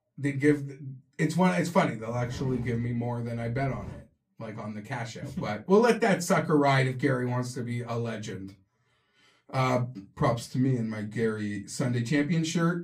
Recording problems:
off-mic speech; far
room echo; very slight; dies away in 0.2 s

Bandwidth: 15 kHz